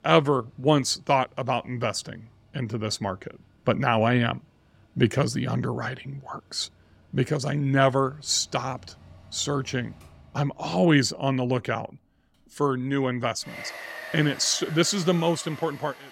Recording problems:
machinery noise; noticeable; throughout; 15 dB below the speech

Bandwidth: 16 kHz